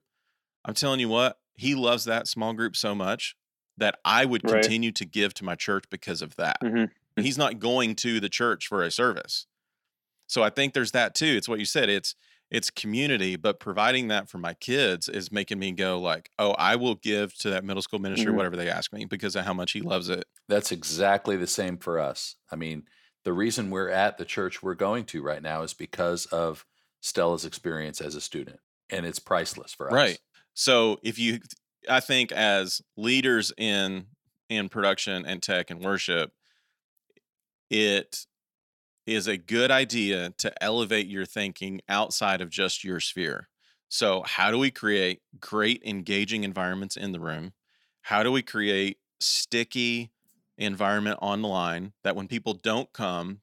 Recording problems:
none

